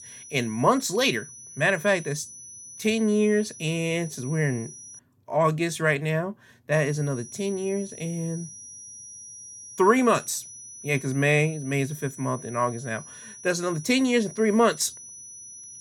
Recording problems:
high-pitched whine; noticeable; until 5 s and from 6.5 s on; 6 kHz, 15 dB below the speech

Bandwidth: 18 kHz